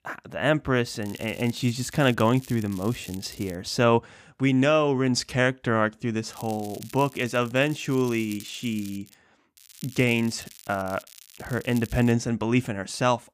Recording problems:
crackling; faint; from 1 to 3.5 s, from 6.5 to 9 s and from 9.5 to 12 s; 20 dB below the speech

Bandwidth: 15 kHz